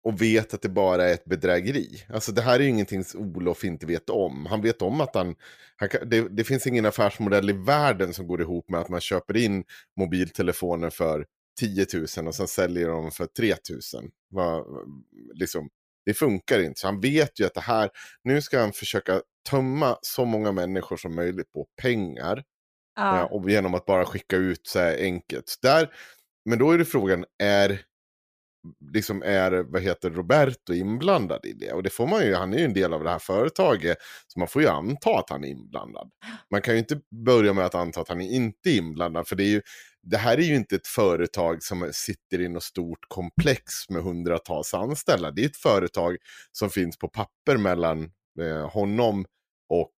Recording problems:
none

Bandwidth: 15 kHz